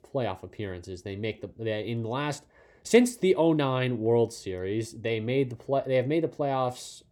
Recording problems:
none

